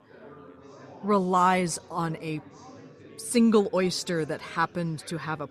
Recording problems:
chatter from many people; faint; throughout; 20 dB below the speech

